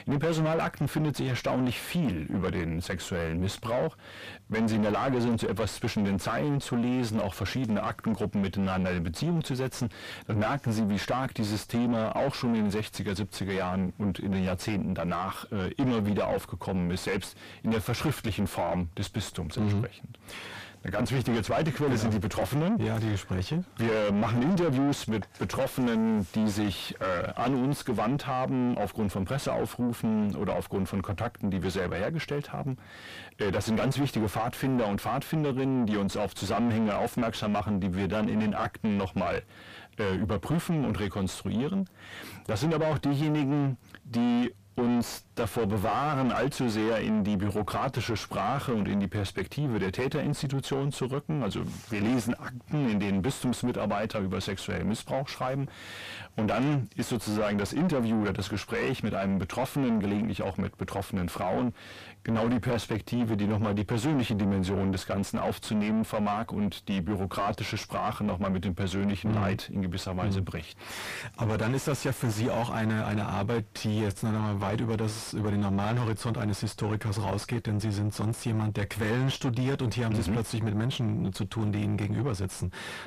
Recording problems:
distortion; heavy; 5 dB below the speech

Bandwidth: 15 kHz